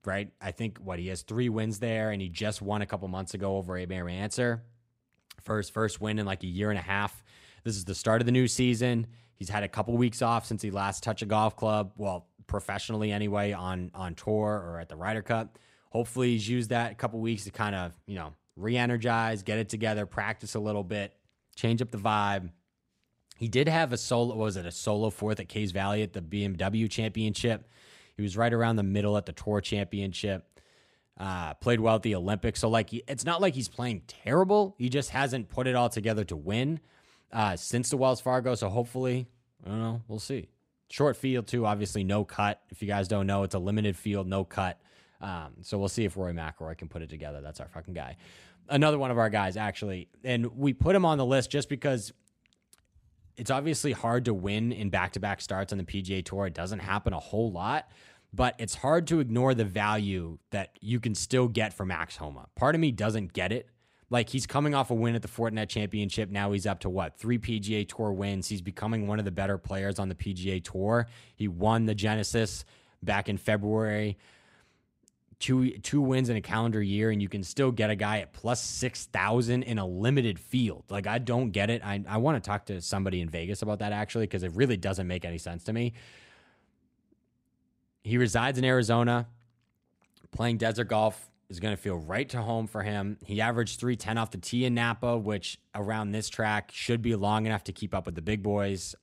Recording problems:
none

